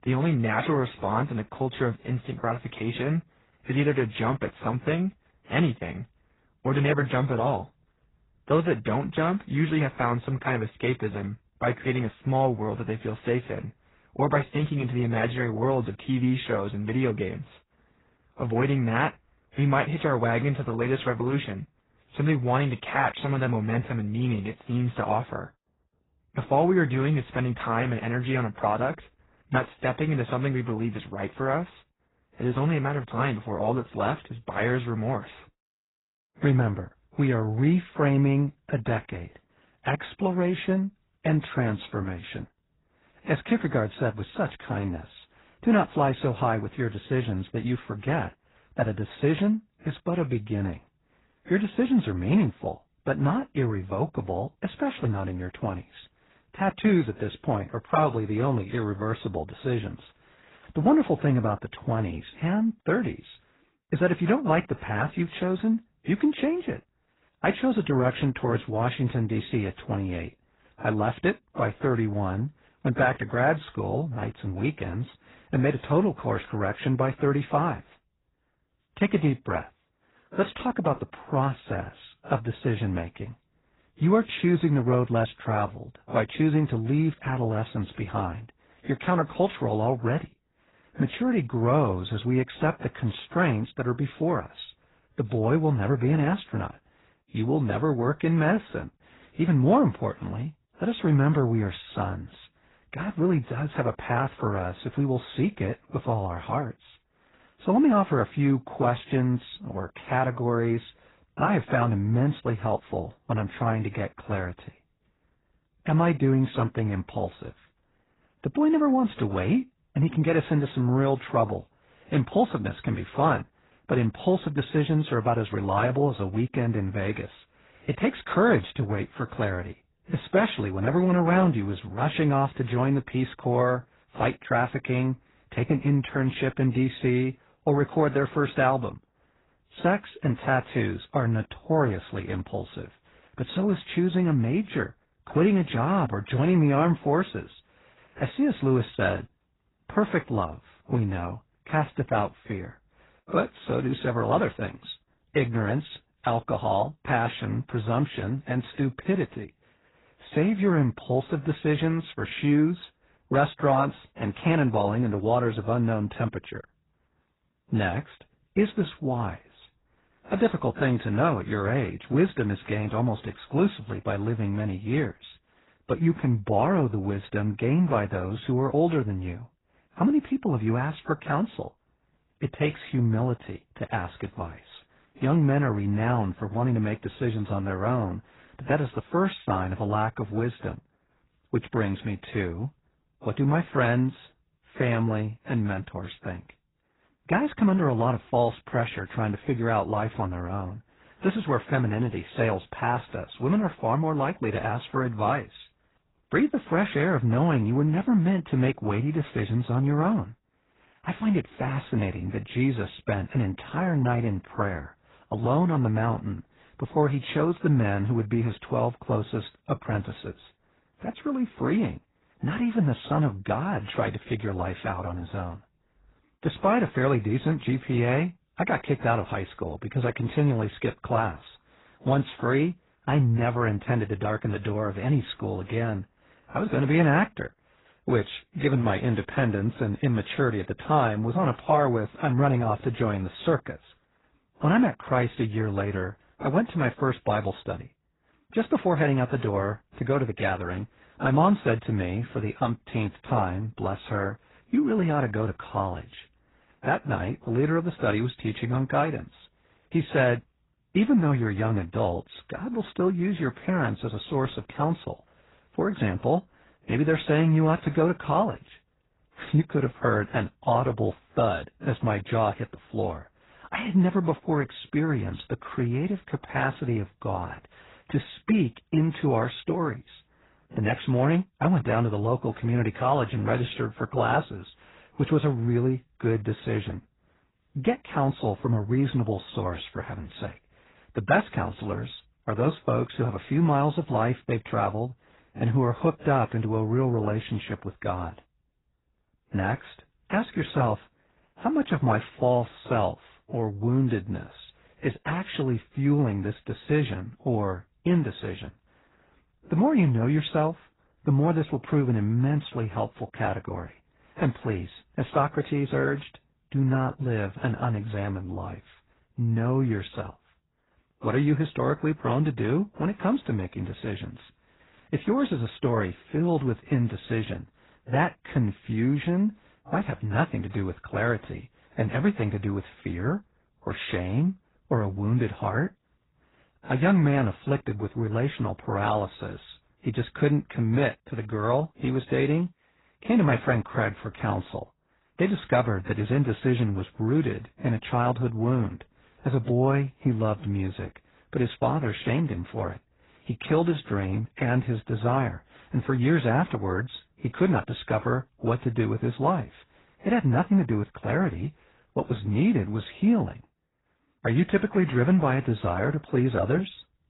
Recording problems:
garbled, watery; badly; nothing above 4 kHz

